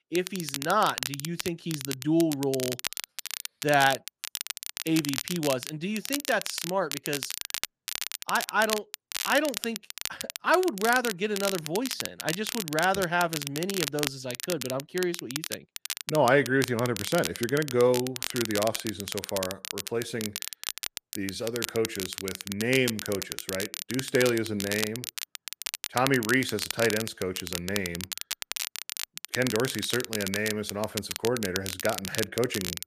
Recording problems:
crackle, like an old record; loud; 5 dB below the speech

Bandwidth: 14.5 kHz